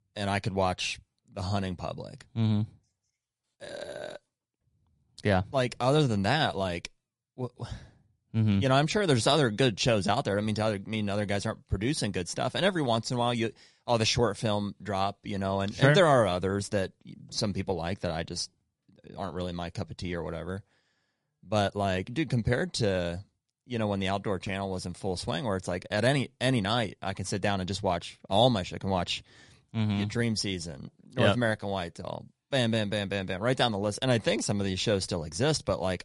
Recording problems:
garbled, watery; slightly; nothing above 11 kHz

